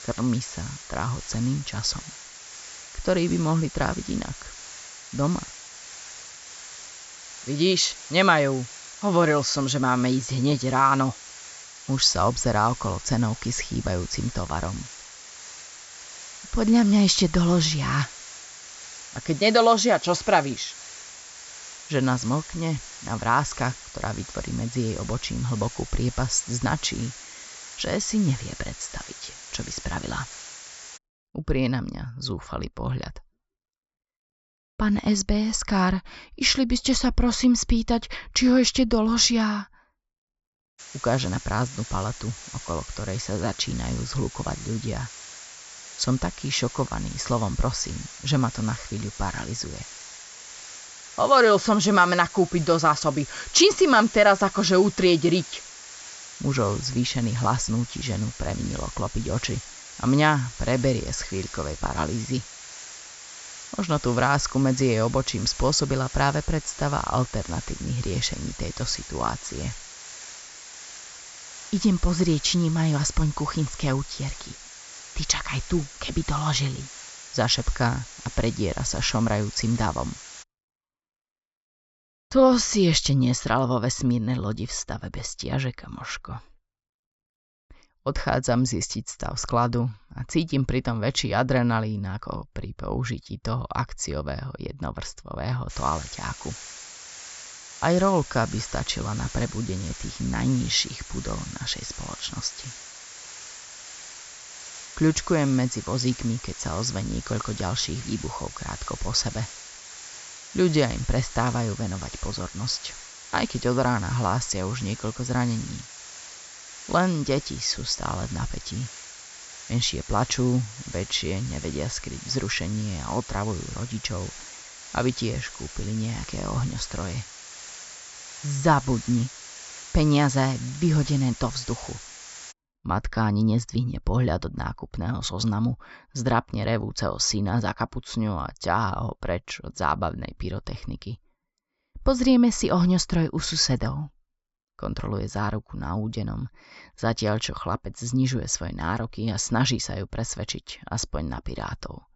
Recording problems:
high frequencies cut off; noticeable; nothing above 8 kHz
hiss; noticeable; until 31 s, from 41 s to 1:20 and from 1:36 to 2:13; 15 dB below the speech

